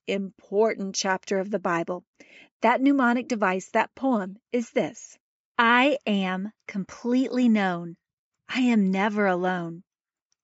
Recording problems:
high frequencies cut off; noticeable; nothing above 8 kHz

